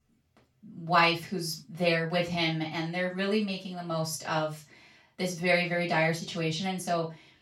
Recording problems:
off-mic speech; far
room echo; noticeable; dies away in 0.2 s

